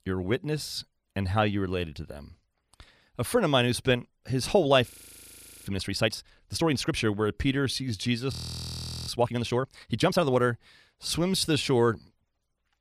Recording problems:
audio freezing; at 5 s for 1 s and at 8.5 s for 1 s

